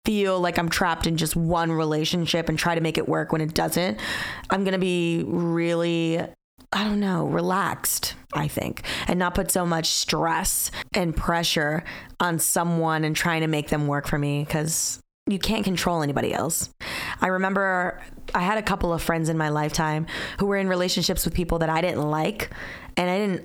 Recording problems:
squashed, flat; heavily

